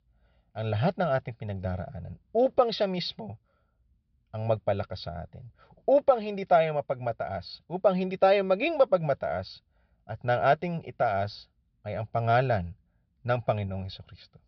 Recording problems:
high frequencies cut off; noticeable; nothing above 5.5 kHz

